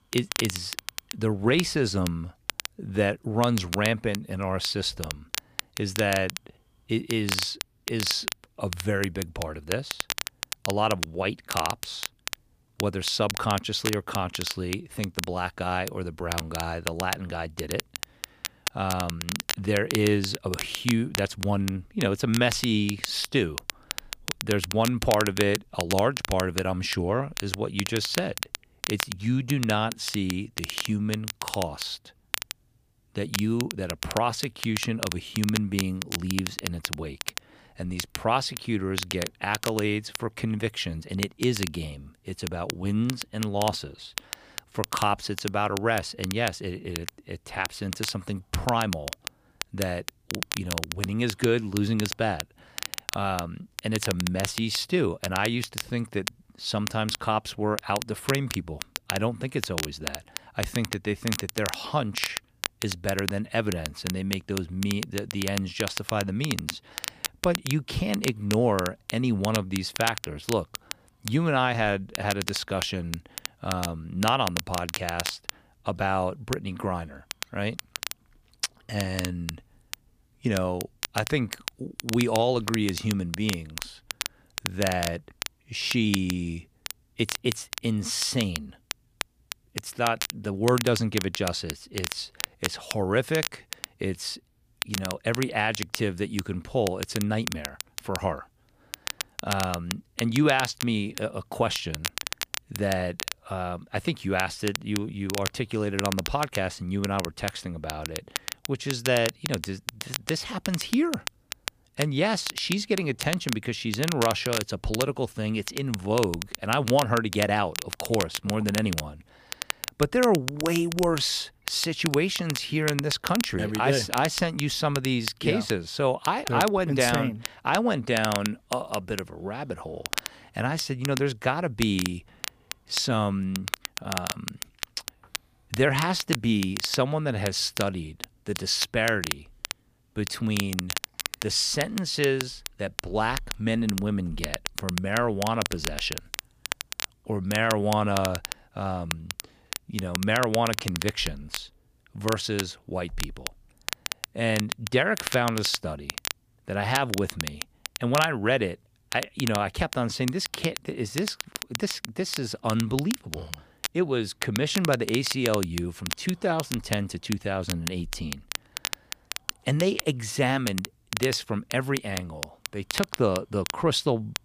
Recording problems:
crackle, like an old record; loud; 7 dB below the speech

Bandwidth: 15 kHz